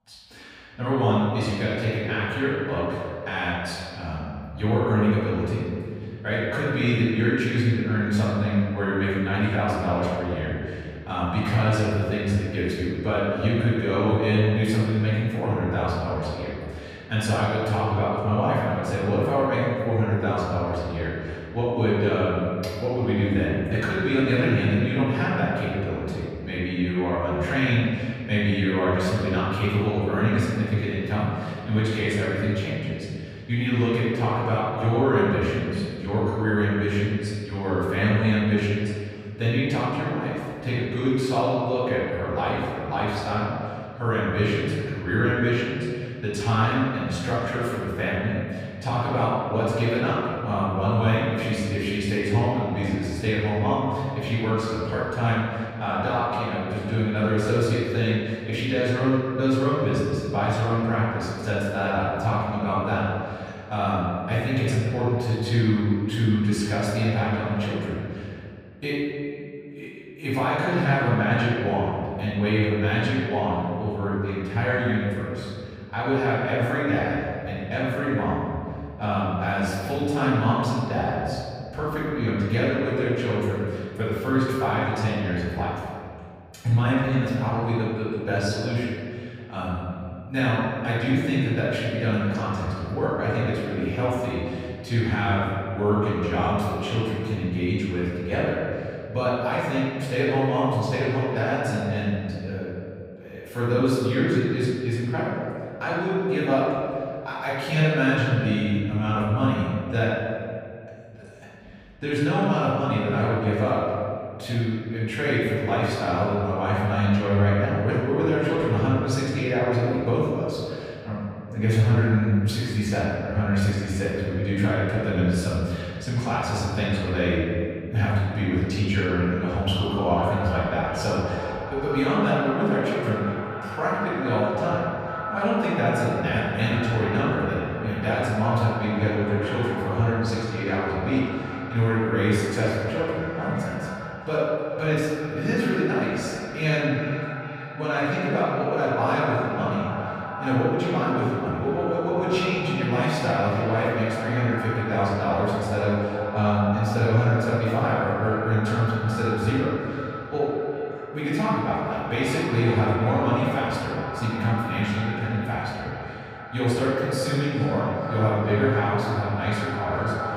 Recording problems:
echo of what is said; strong; from 2:10 on; 400 ms later, 10 dB below the speech
room echo; strong; dies away in 2 s
off-mic speech; far

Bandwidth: 15.5 kHz